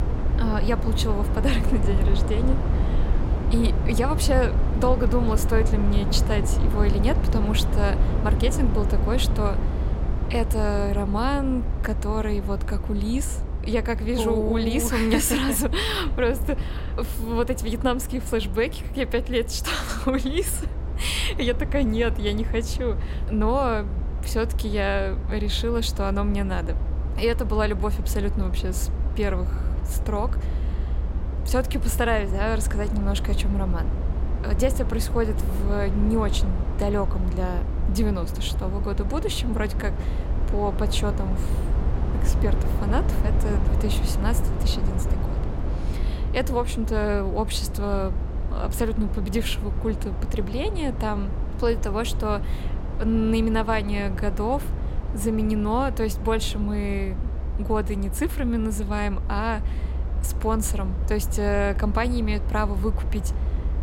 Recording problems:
low rumble; noticeable; throughout; 10 dB below the speech

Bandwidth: 16 kHz